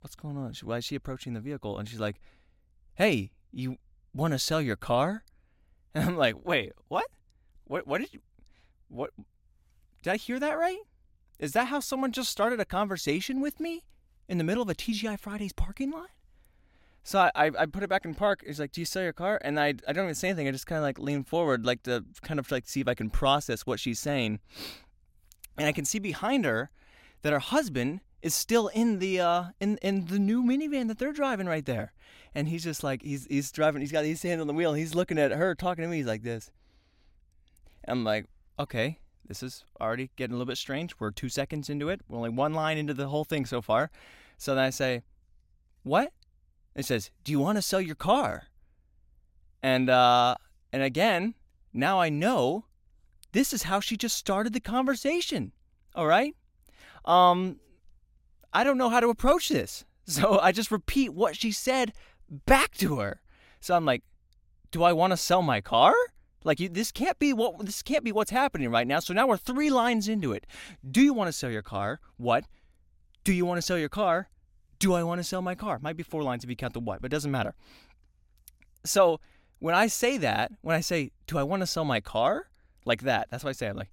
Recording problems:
none

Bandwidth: 16 kHz